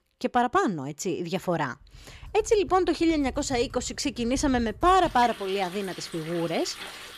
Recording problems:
household noises; noticeable; from 2 s on; 15 dB below the speech

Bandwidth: 14.5 kHz